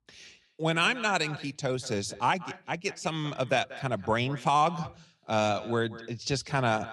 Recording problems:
echo of what is said; noticeable; throughout; 190 ms later, 15 dB below the speech

